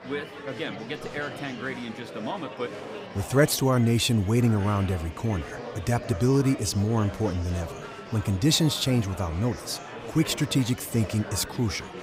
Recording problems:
murmuring crowd; noticeable; throughout; 15 dB below the speech

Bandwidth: 15.5 kHz